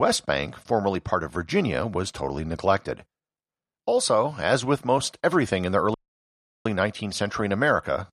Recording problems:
abrupt cut into speech; at the start
audio cutting out; at 6 s for 0.5 s

